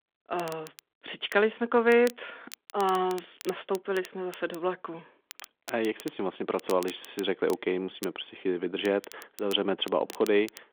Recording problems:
phone-call audio; nothing above 3.5 kHz
crackle, like an old record; noticeable; 20 dB below the speech

